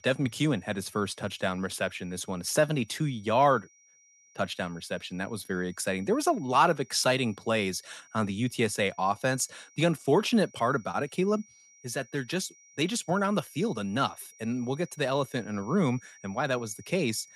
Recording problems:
high-pitched whine; faint; throughout; 5.5 kHz, 25 dB below the speech

